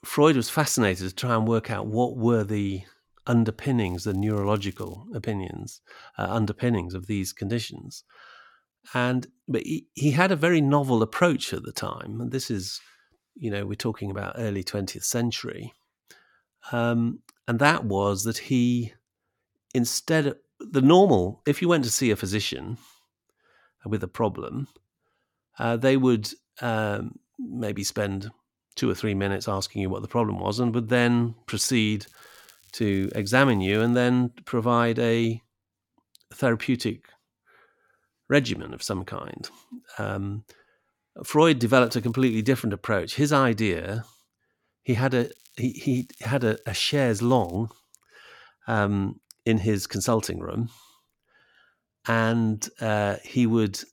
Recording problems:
crackling; faint; 4 times, first at 4 s; 30 dB below the speech

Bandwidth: 17.5 kHz